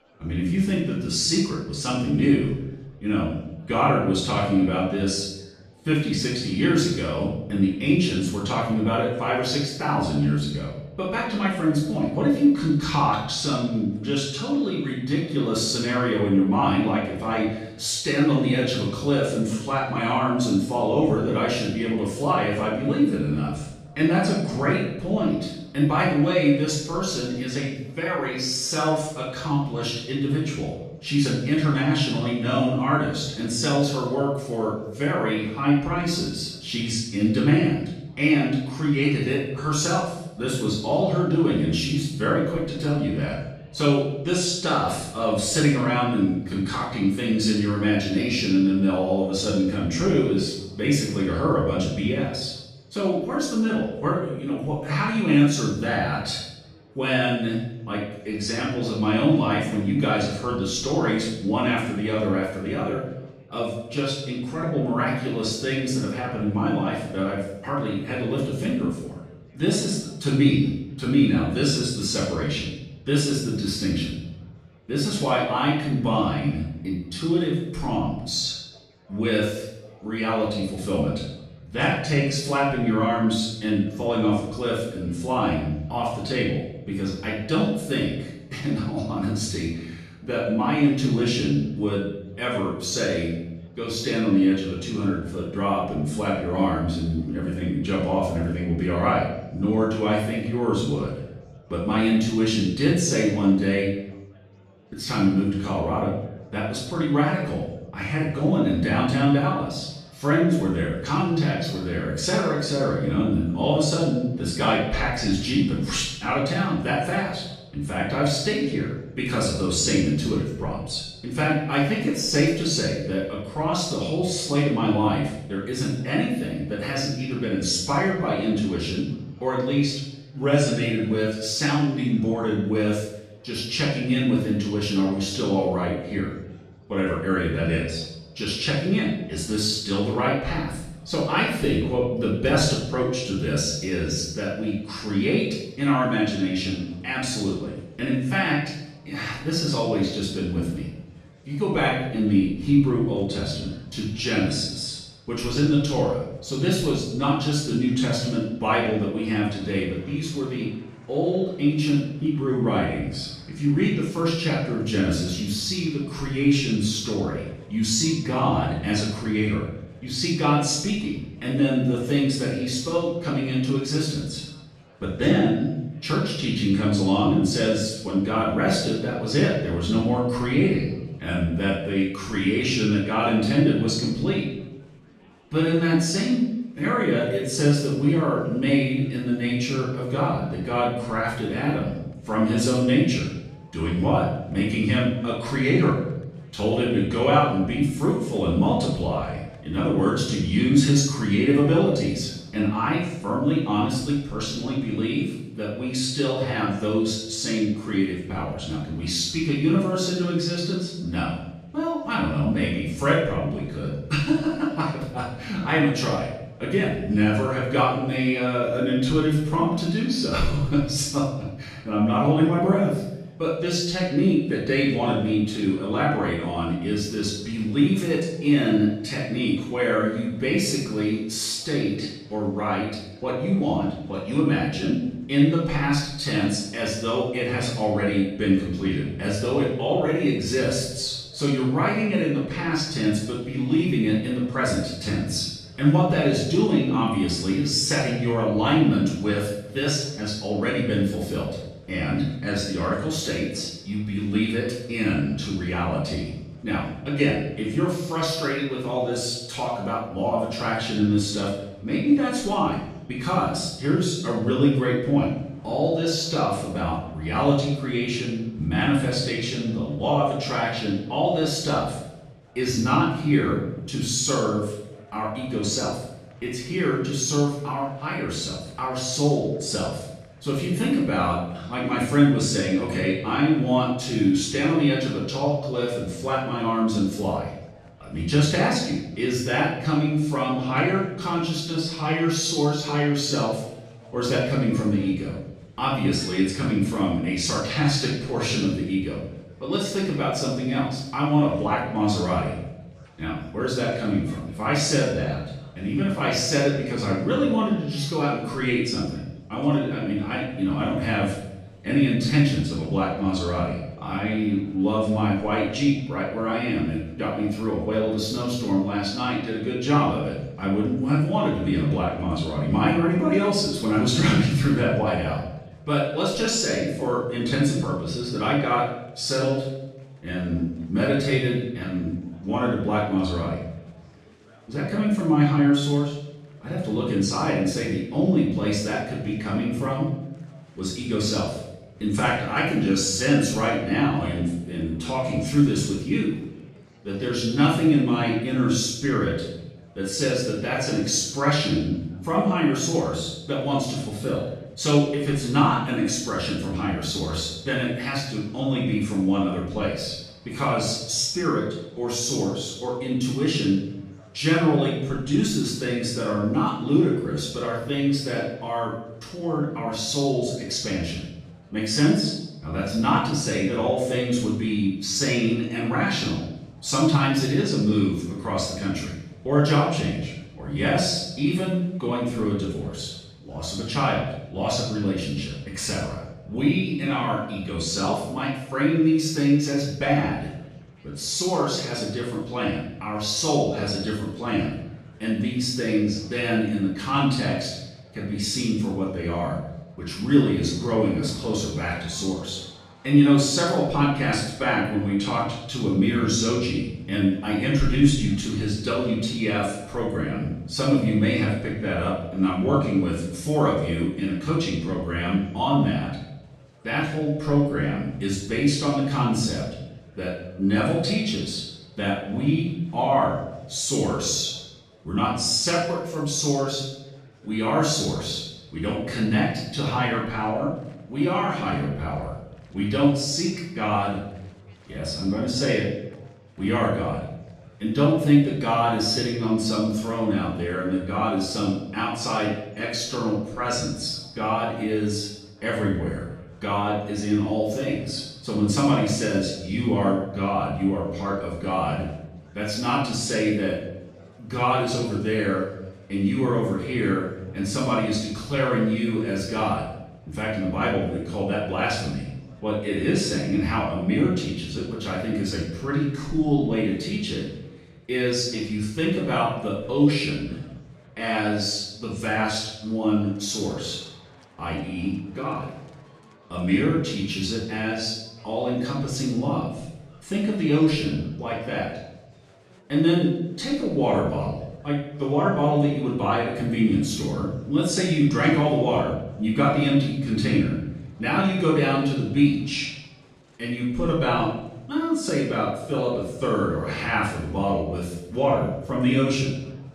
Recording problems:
off-mic speech; far
room echo; noticeable; dies away in 0.8 s
murmuring crowd; faint; throughout; 30 dB below the speech

